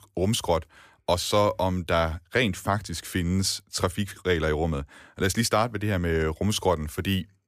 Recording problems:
none

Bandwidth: 15 kHz